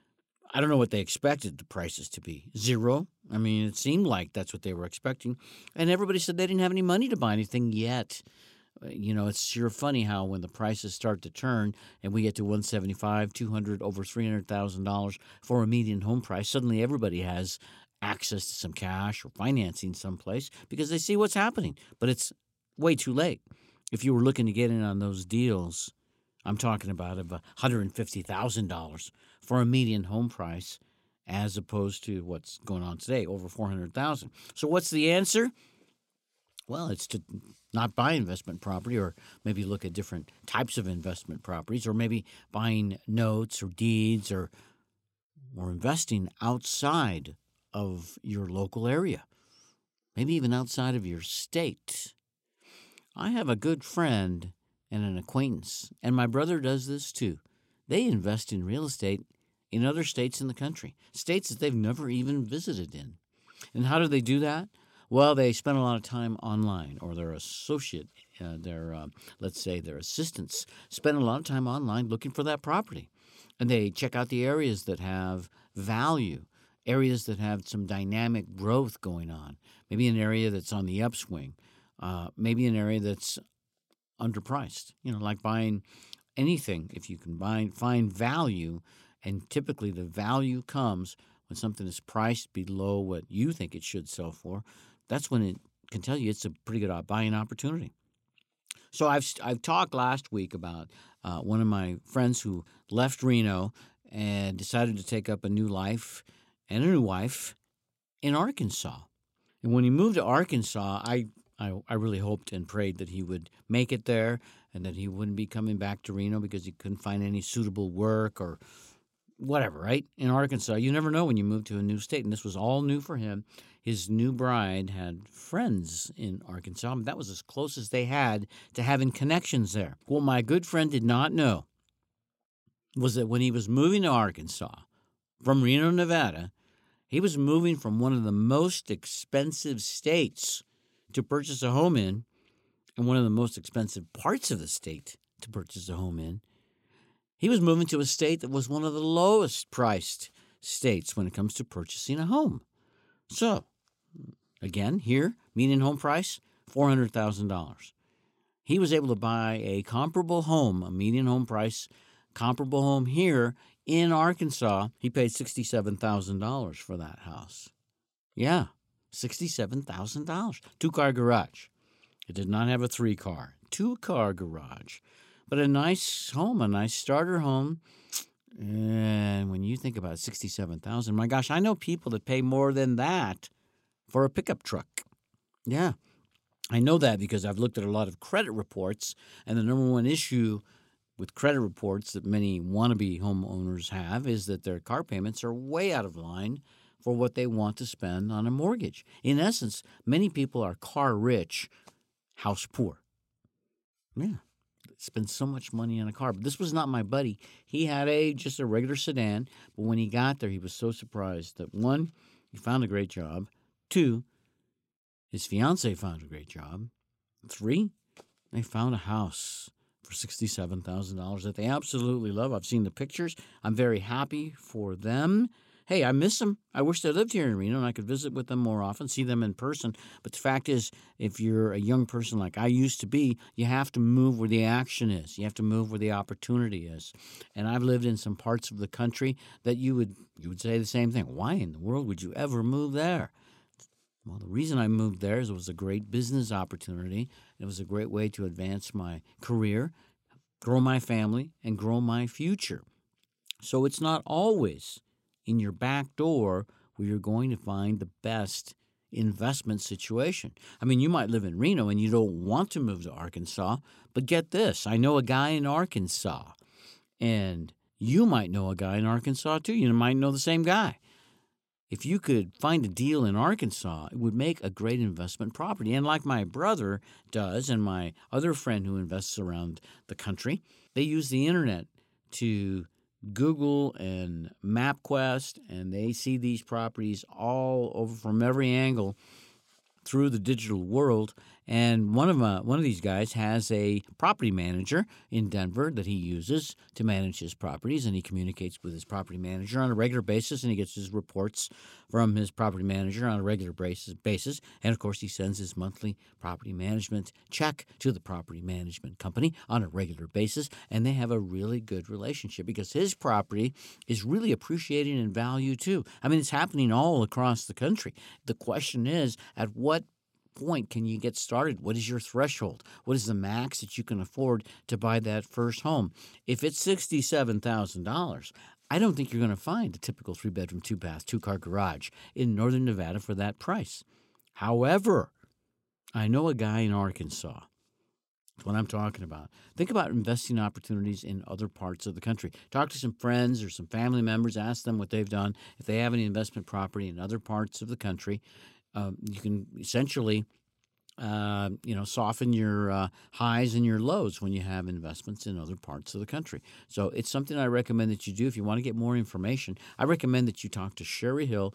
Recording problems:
none

